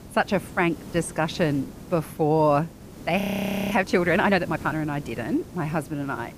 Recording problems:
hiss; noticeable; throughout; 15 dB below the speech
audio freezing; at 3 s for 0.5 s

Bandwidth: 15 kHz